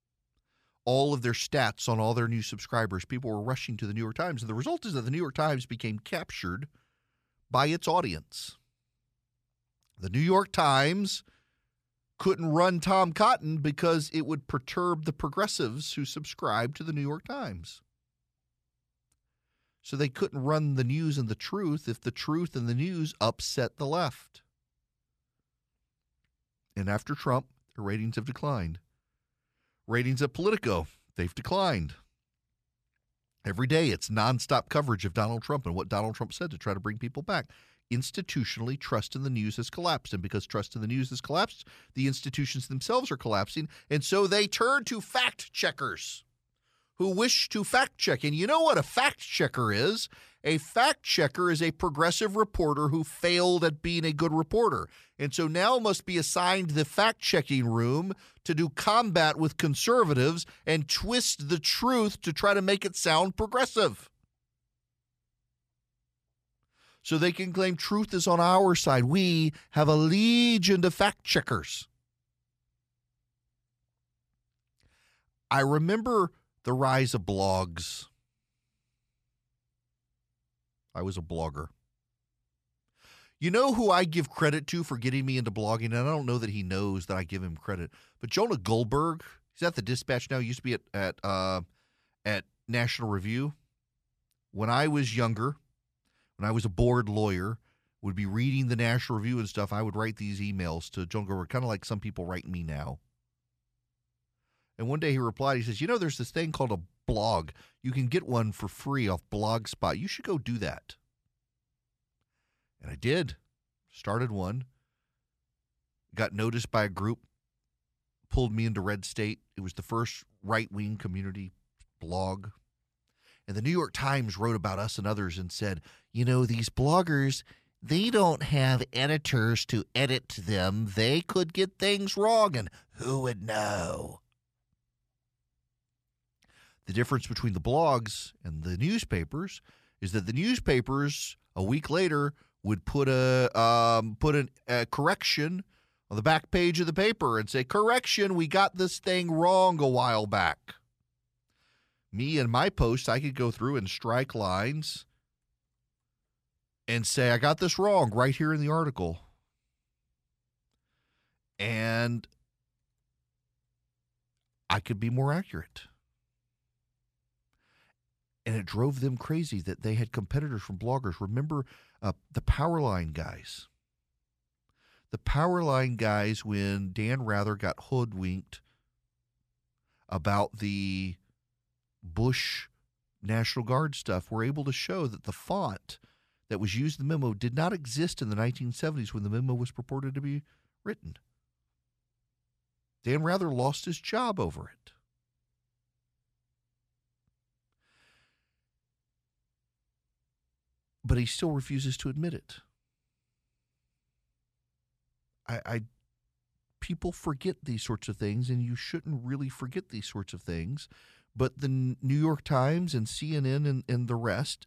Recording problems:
none

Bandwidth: 14.5 kHz